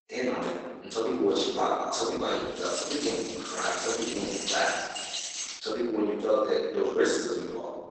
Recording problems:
room echo; strong; dies away in 1.3 s
off-mic speech; far
garbled, watery; badly; nothing above 8 kHz
thin; somewhat; fading below 300 Hz
jangling keys; noticeable; from 2.5 to 5.5 s; peak level with the speech

